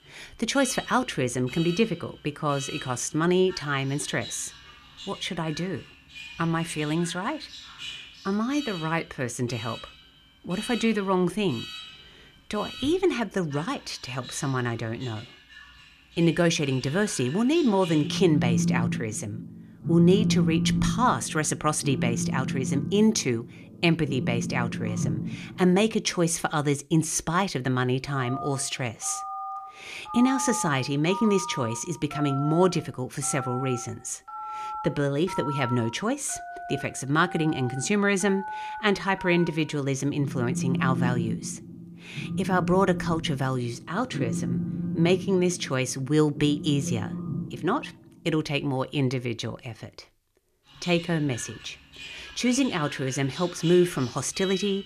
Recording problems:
alarms or sirens; loud; throughout; 8 dB below the speech

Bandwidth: 14.5 kHz